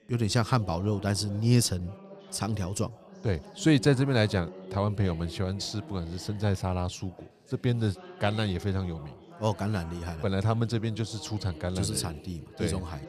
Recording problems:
background chatter; noticeable; throughout; 4 voices, 20 dB below the speech

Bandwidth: 14.5 kHz